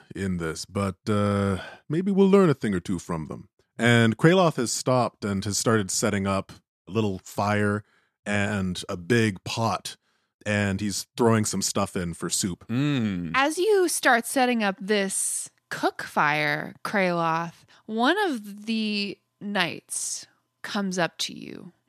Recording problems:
none

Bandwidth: 14 kHz